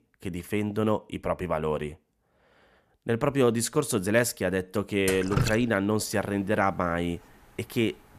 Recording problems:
rain or running water; loud; from 3.5 s on; 4 dB below the speech

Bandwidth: 14.5 kHz